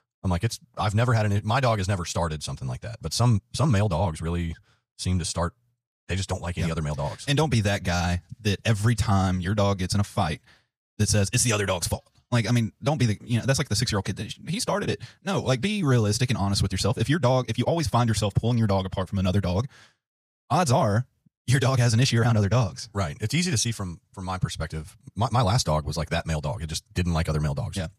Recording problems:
wrong speed, natural pitch; too fast; 1.6 times normal speed

